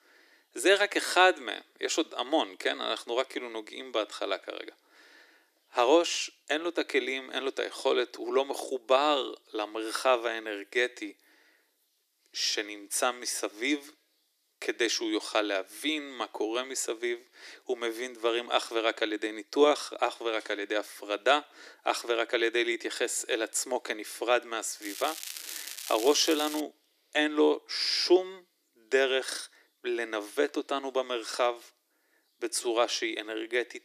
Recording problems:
thin; very; fading below 300 Hz
crackling; loud; from 25 to 27 s; 9 dB below the speech

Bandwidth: 14.5 kHz